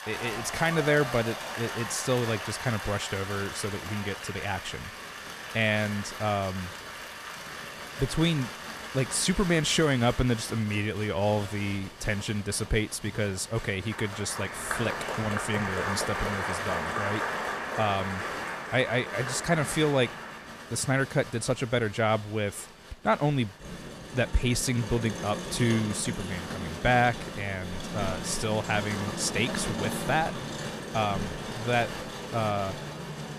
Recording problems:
crowd noise; loud; throughout; 7 dB below the speech

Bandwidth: 14 kHz